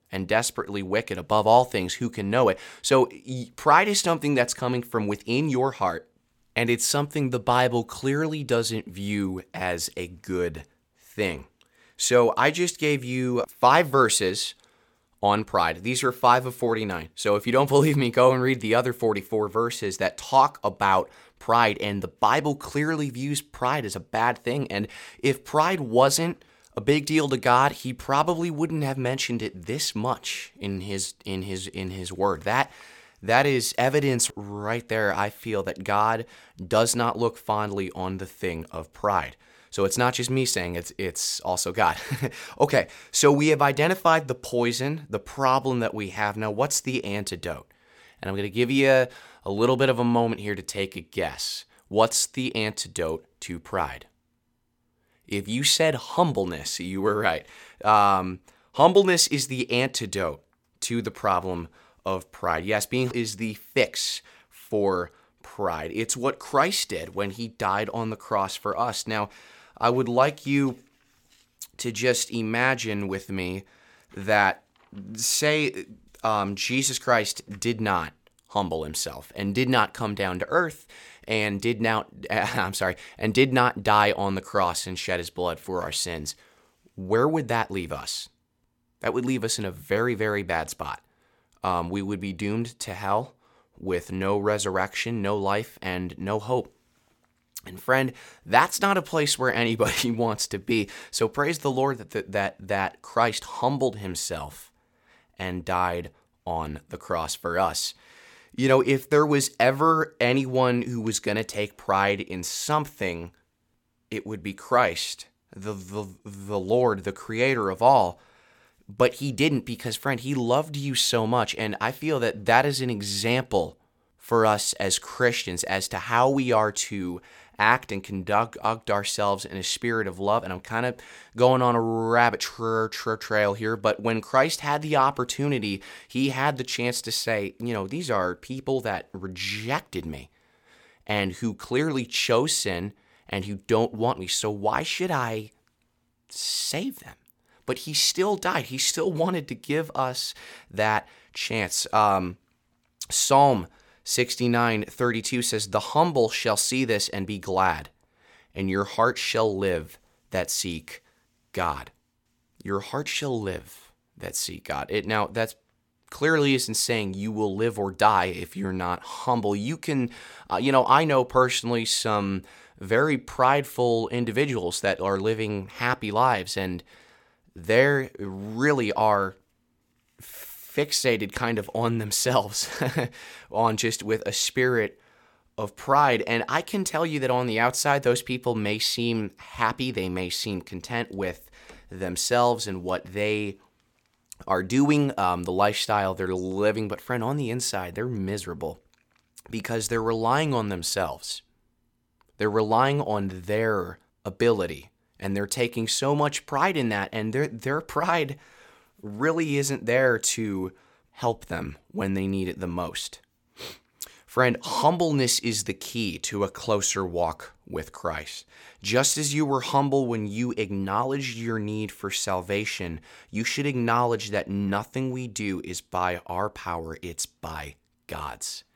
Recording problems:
none

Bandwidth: 17 kHz